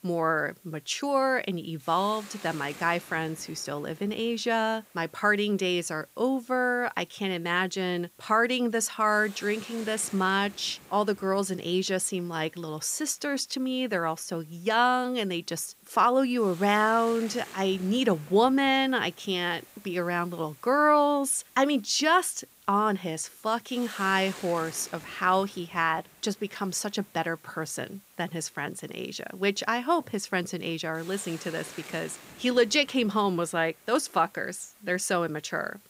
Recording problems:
hiss; faint; throughout; 20 dB below the speech

